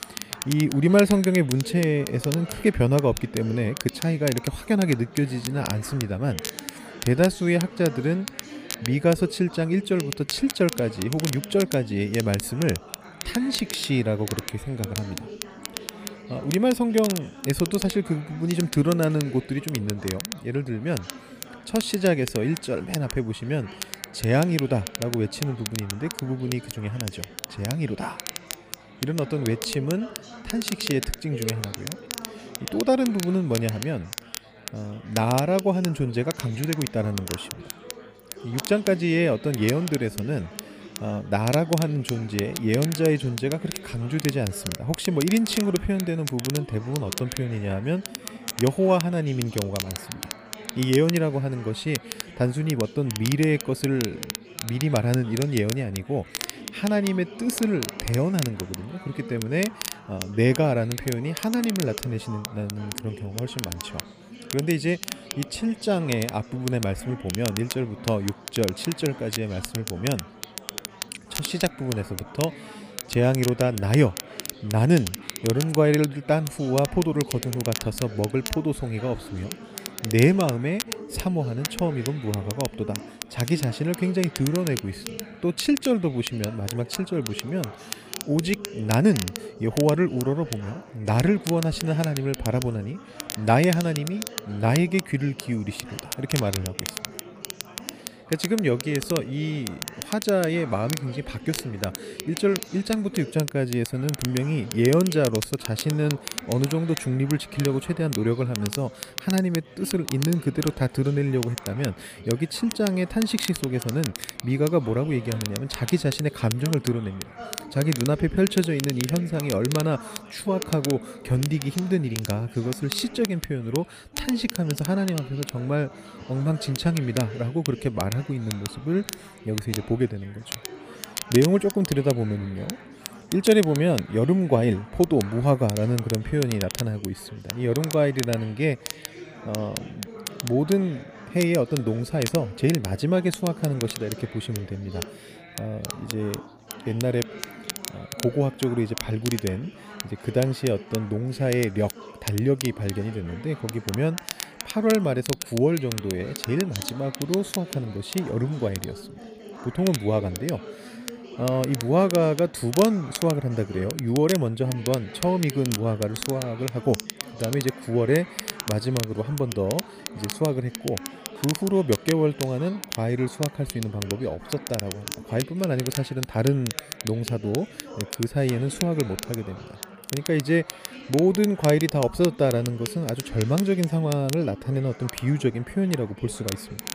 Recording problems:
chatter from many people; noticeable; throughout; 15 dB below the speech
crackle, like an old record; noticeable; 10 dB below the speech

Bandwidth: 15 kHz